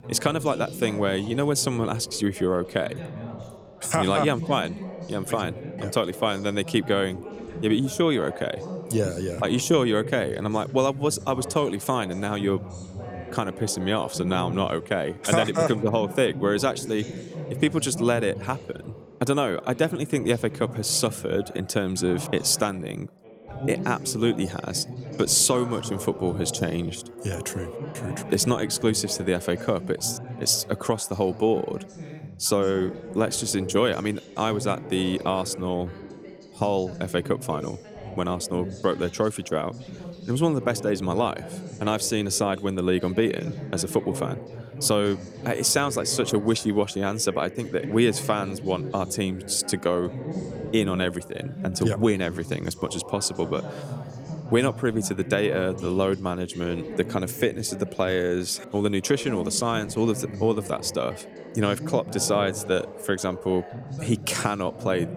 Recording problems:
background chatter; noticeable; throughout; 3 voices, 10 dB below the speech

